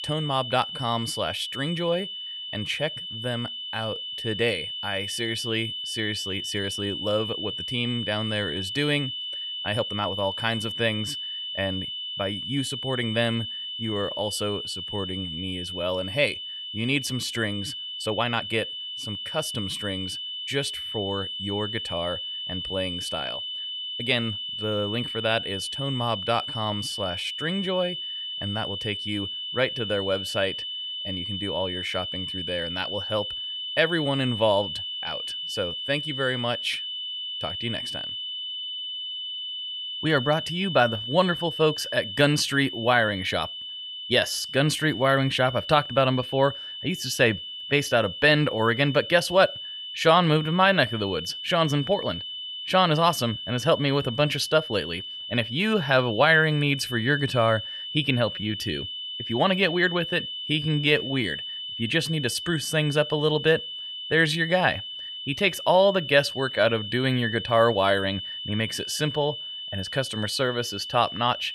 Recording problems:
high-pitched whine; loud; throughout; 3 kHz, 6 dB below the speech
uneven, jittery; strongly; from 0.5 s to 1:07

